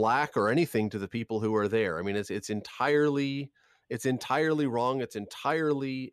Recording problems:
abrupt cut into speech; at the start

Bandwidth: 14 kHz